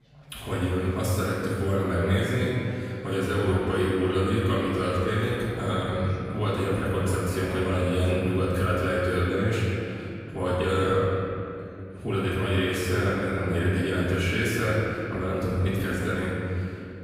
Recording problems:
room echo; strong; dies away in 2.7 s
off-mic speech; far
chatter from many people; faint; throughout; 25 dB below the speech

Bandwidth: 15.5 kHz